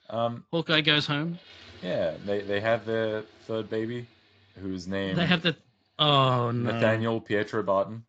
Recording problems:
garbled, watery; slightly; nothing above 7.5 kHz
household noises; faint; throughout; 25 dB below the speech

